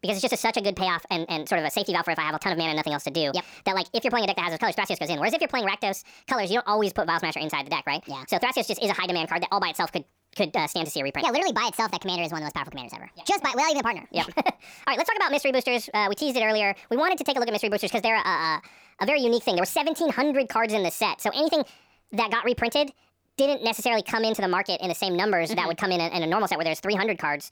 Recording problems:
wrong speed and pitch; too fast and too high; 1.5 times normal speed

